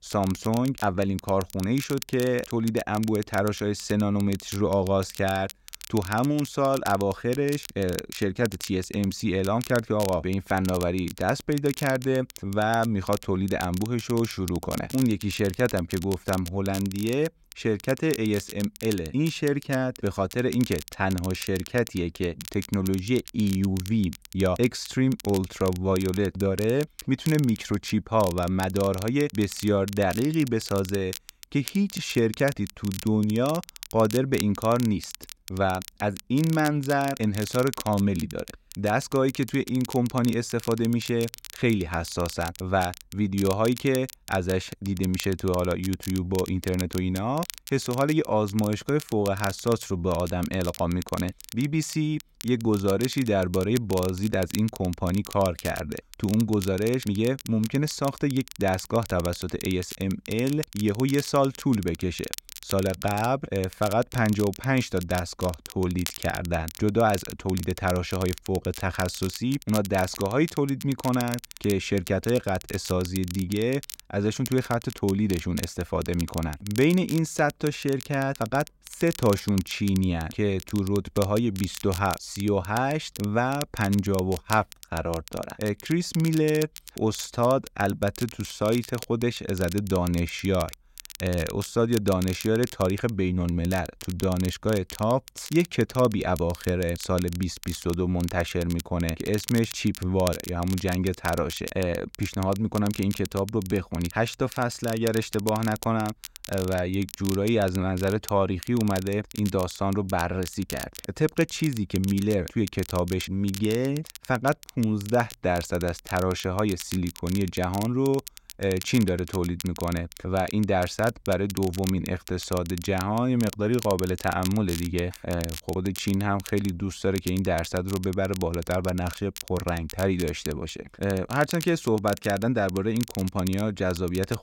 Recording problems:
crackle, like an old record; noticeable; 15 dB below the speech

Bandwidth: 16 kHz